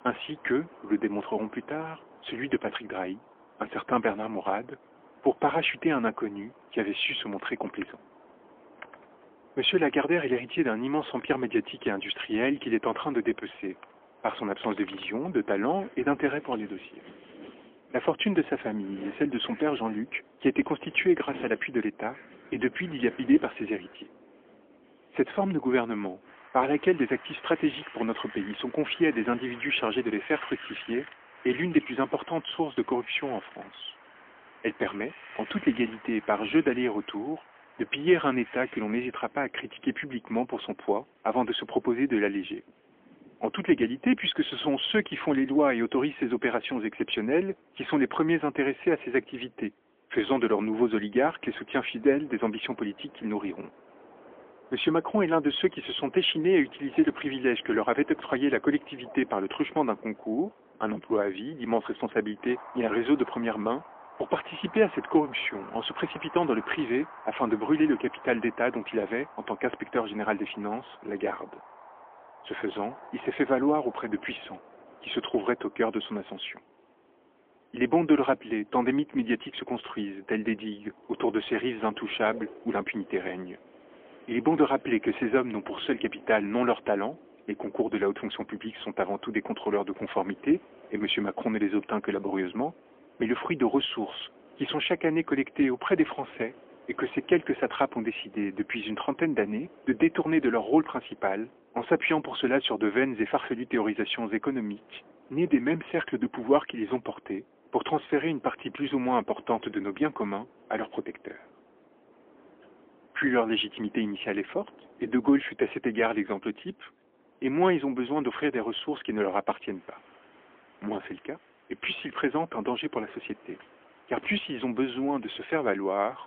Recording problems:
phone-call audio; poor line; nothing above 3.5 kHz
wind in the background; faint; throughout; 20 dB below the speech

